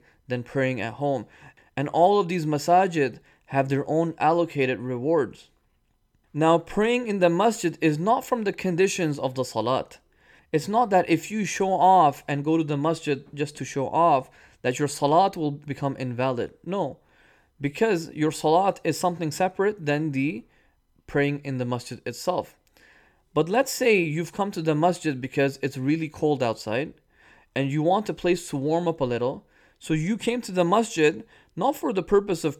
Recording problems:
none

